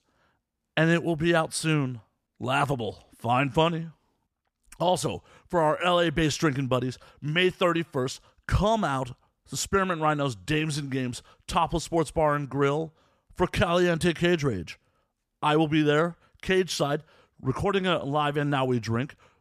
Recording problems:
none

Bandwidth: 14.5 kHz